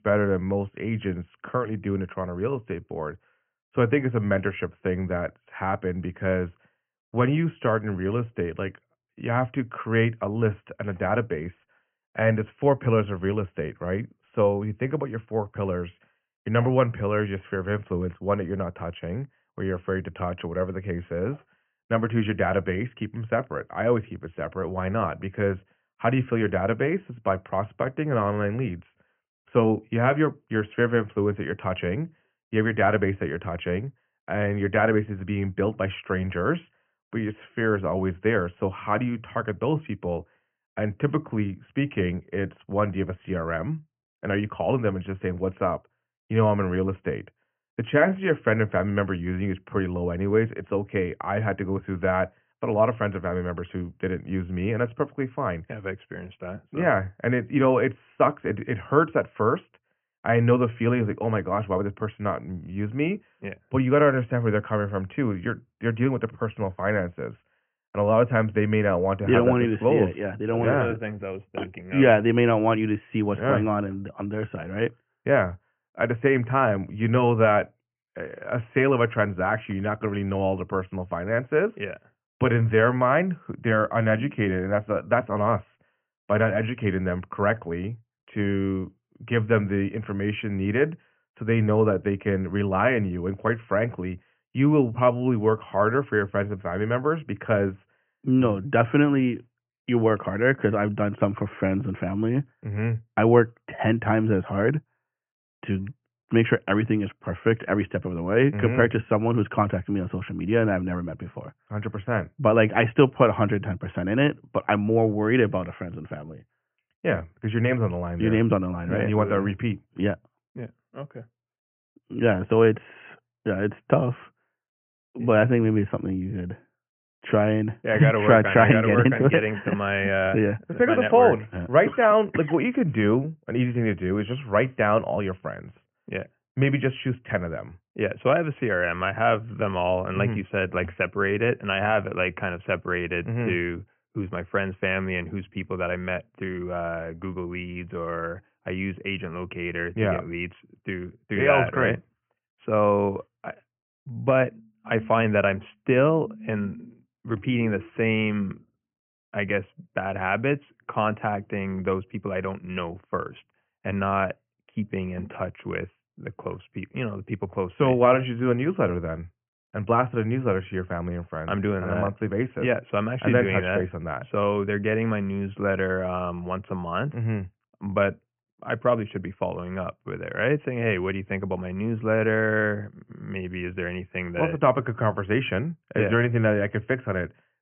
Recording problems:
high frequencies cut off; severe; nothing above 3 kHz

